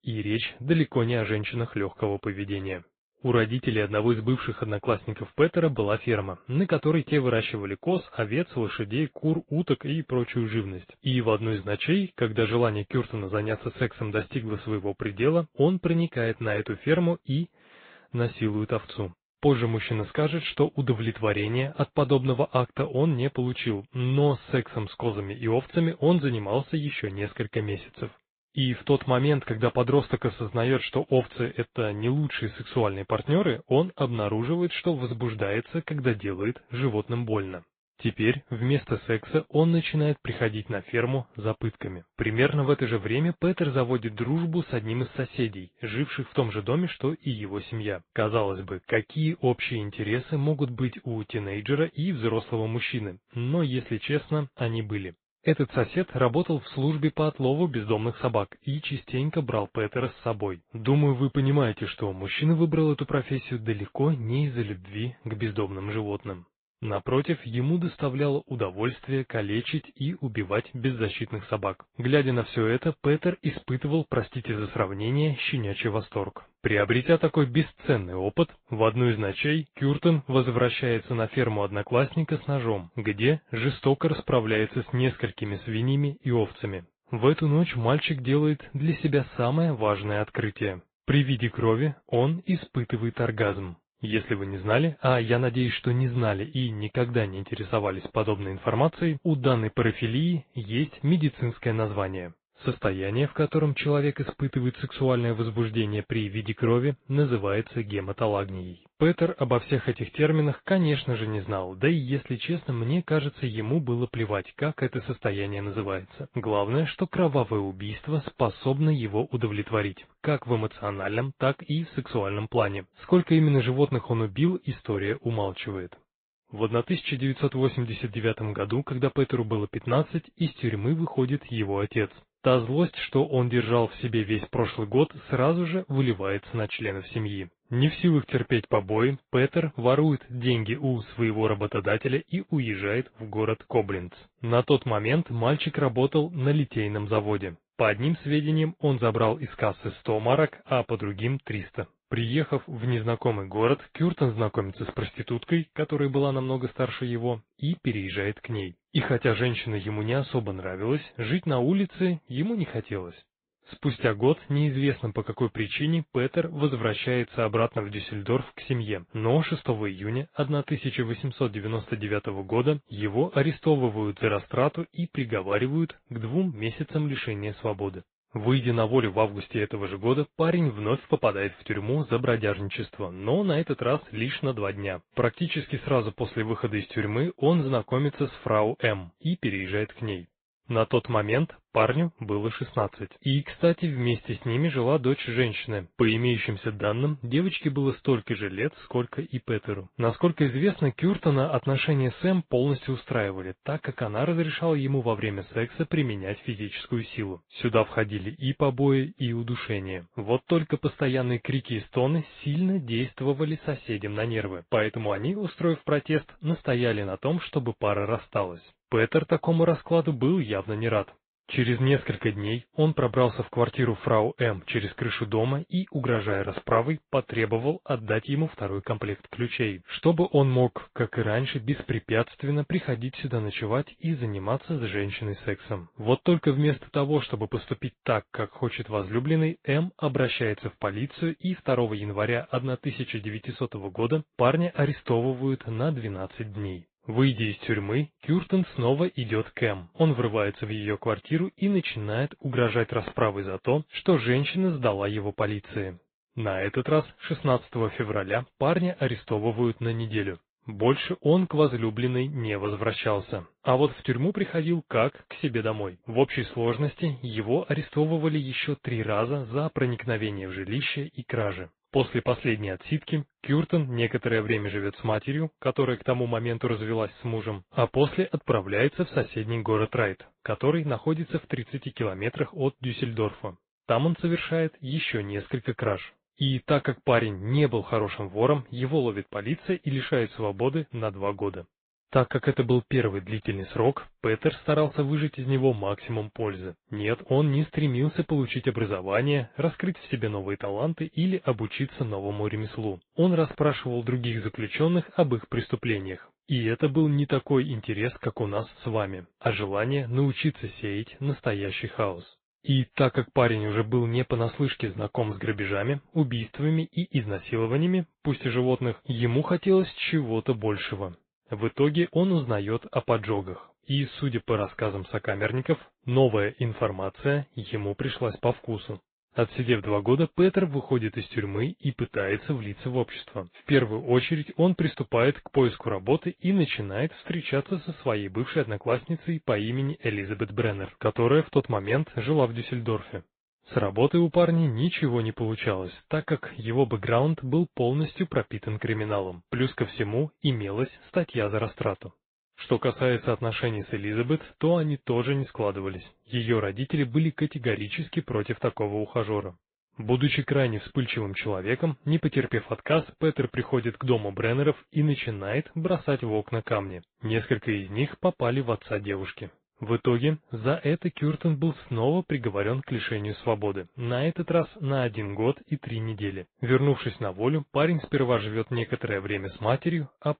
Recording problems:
high frequencies cut off; severe; nothing above 4 kHz
garbled, watery; slightly

